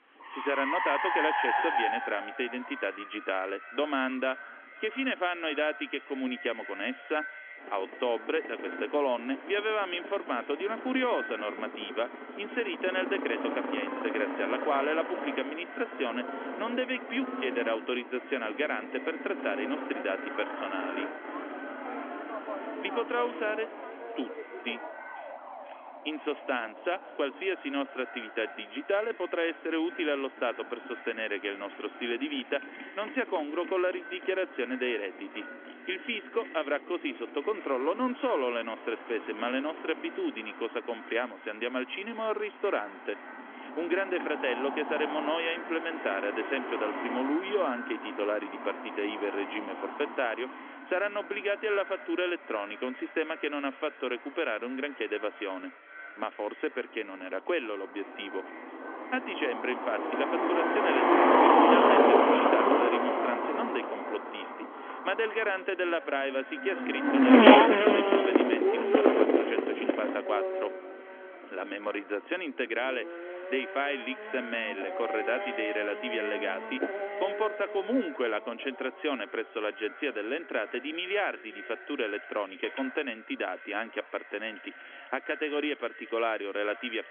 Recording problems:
echo of what is said; noticeable; throughout; 490 ms later, 15 dB below the speech
phone-call audio; nothing above 3.5 kHz
traffic noise; very loud; throughout; 4 dB above the speech

